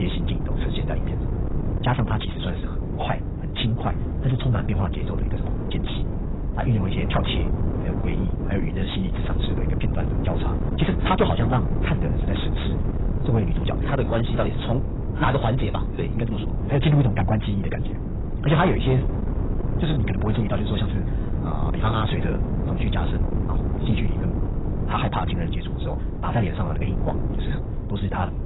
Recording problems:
garbled, watery; badly; nothing above 4 kHz
wrong speed, natural pitch; too fast; 1.5 times normal speed
distortion; slight; 10 dB below the speech
wind noise on the microphone; heavy; 6 dB below the speech
abrupt cut into speech; at the start

